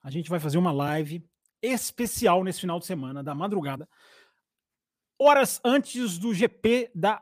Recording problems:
uneven, jittery; slightly; from 1 to 6.5 s

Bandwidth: 15 kHz